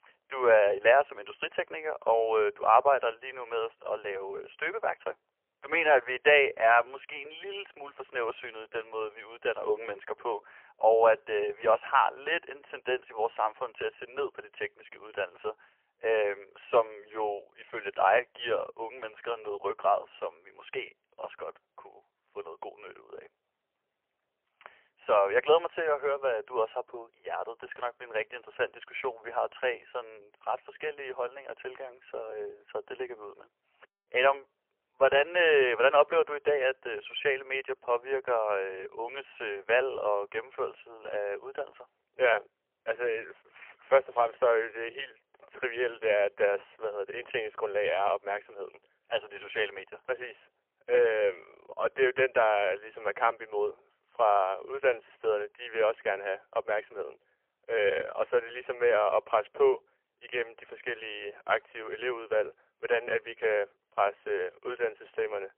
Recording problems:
phone-call audio; poor line; nothing above 3 kHz

